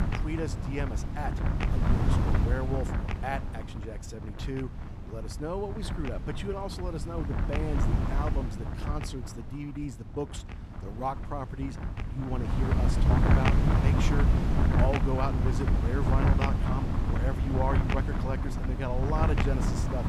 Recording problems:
wind noise on the microphone; heavy; as loud as the speech

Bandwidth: 15 kHz